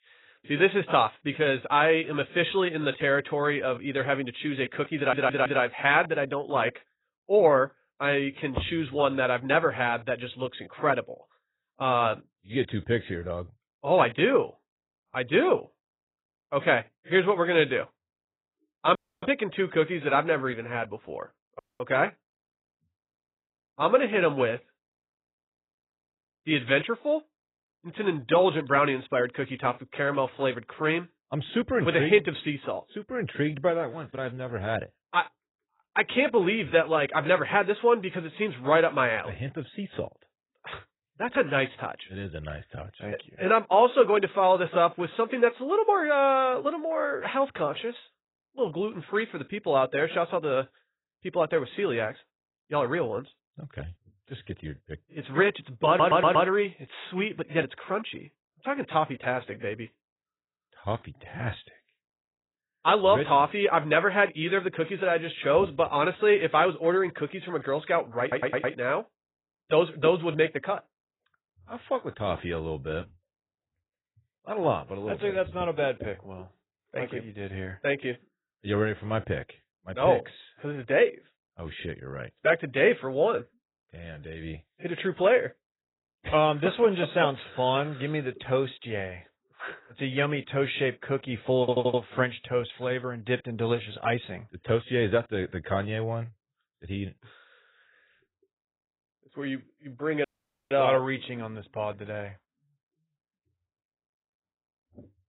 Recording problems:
garbled, watery; badly; nothing above 4 kHz
audio stuttering; 4 times, first at 5 s
audio cutting out; at 19 s, at 22 s and at 1:40

